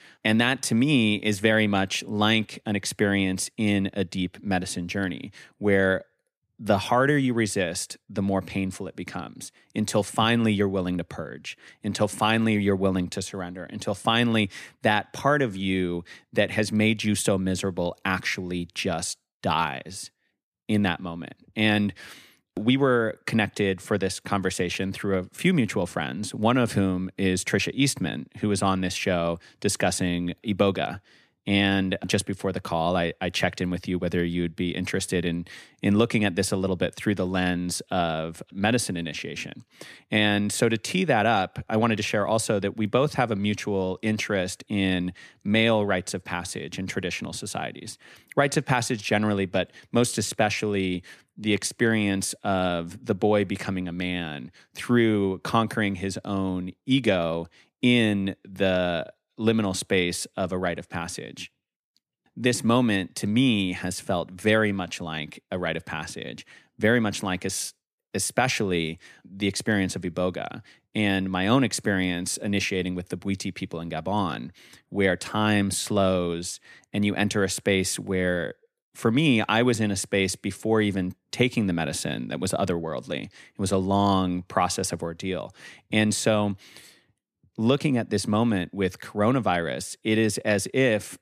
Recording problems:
none

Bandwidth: 14.5 kHz